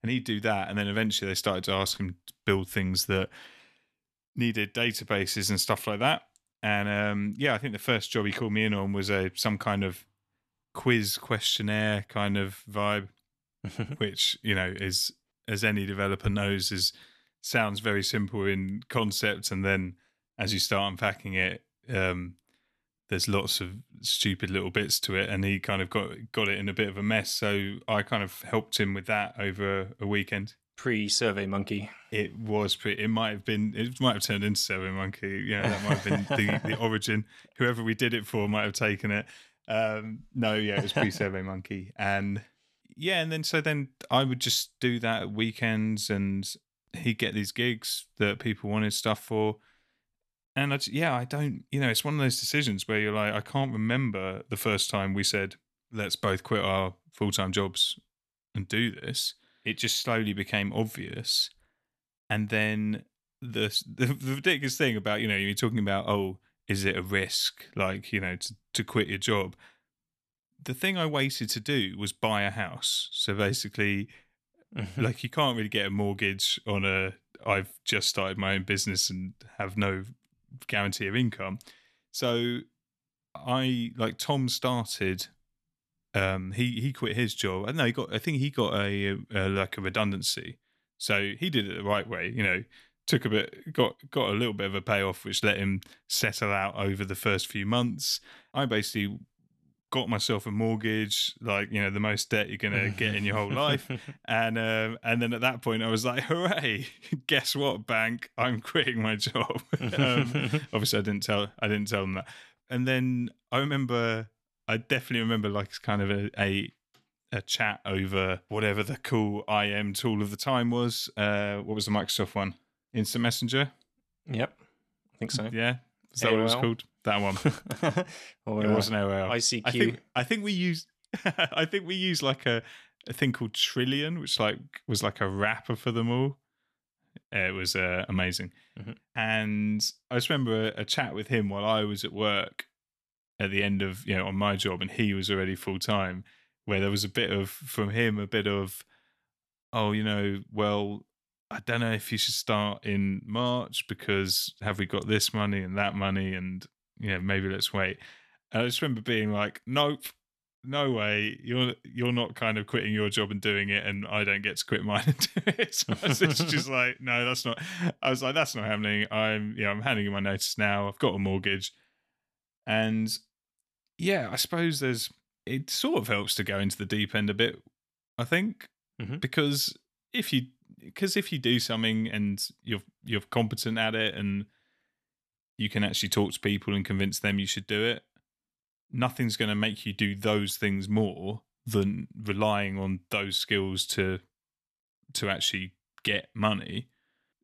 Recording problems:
none

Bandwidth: 13.5 kHz